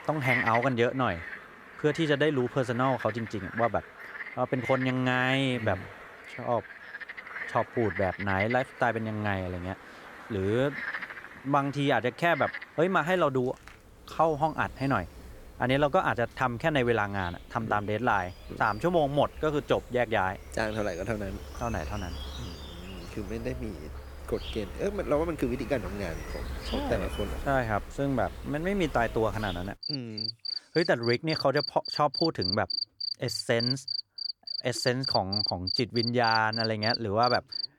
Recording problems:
animal sounds; loud; throughout; 7 dB below the speech

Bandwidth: 18.5 kHz